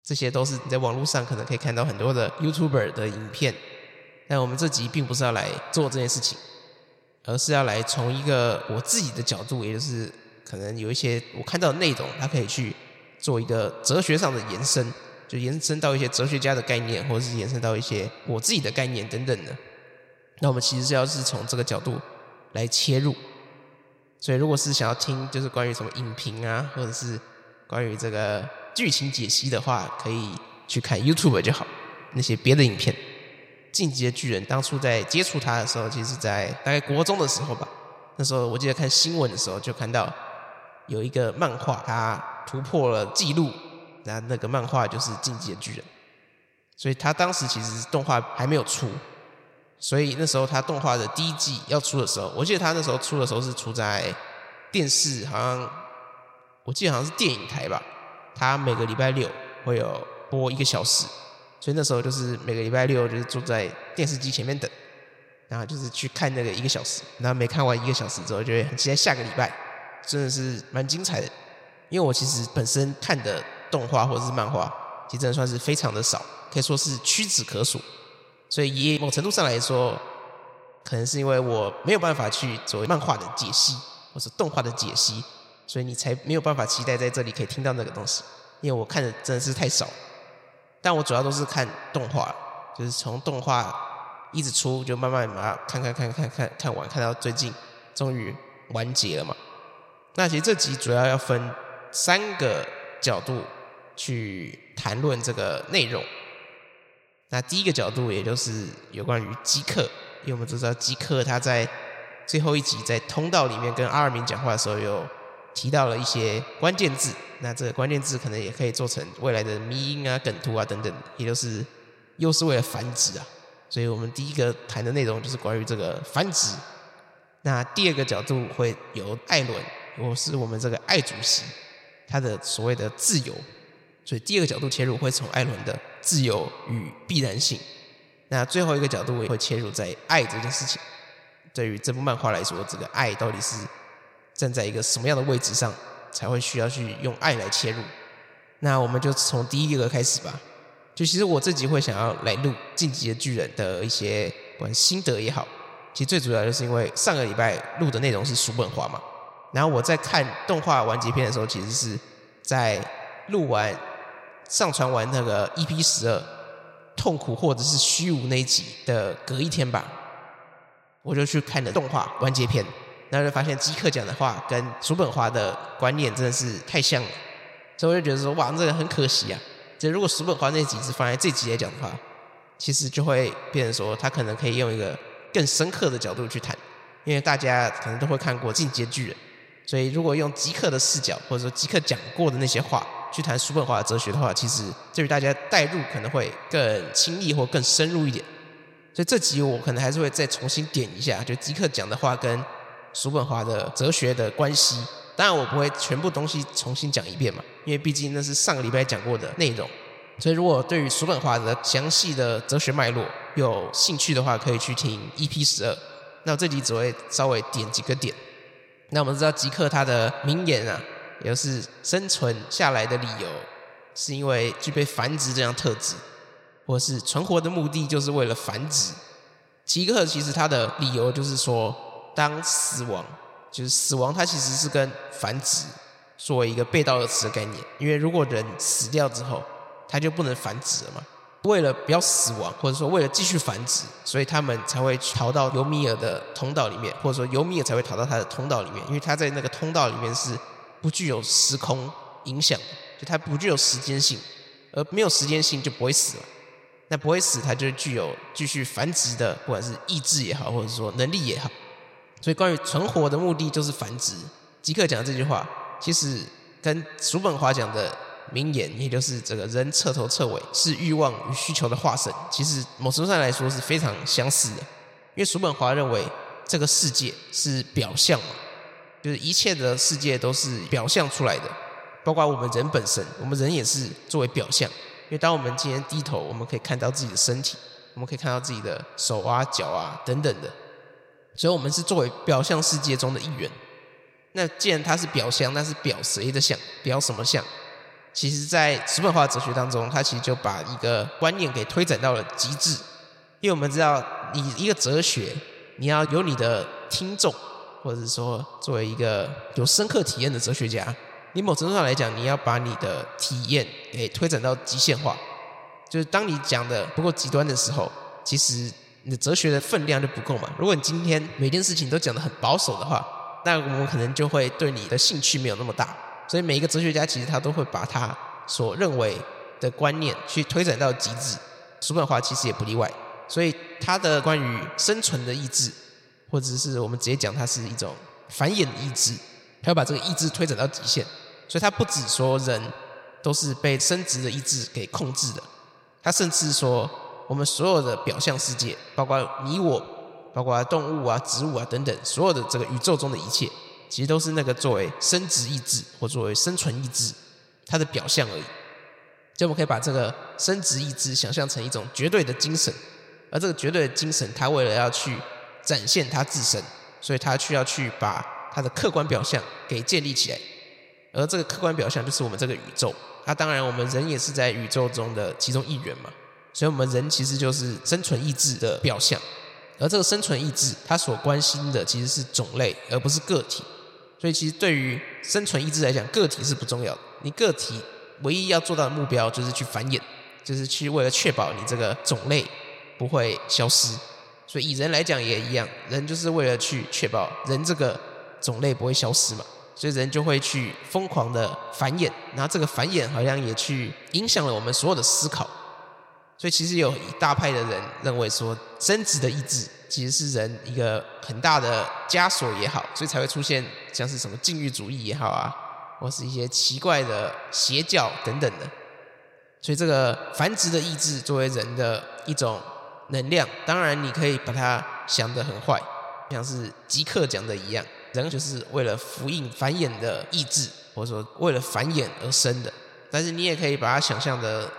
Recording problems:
echo of what is said; noticeable; throughout; 80 ms later, 15 dB below the speech

